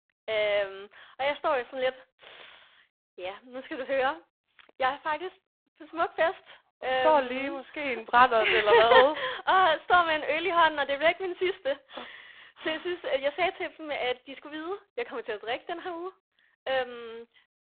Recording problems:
phone-call audio; poor line

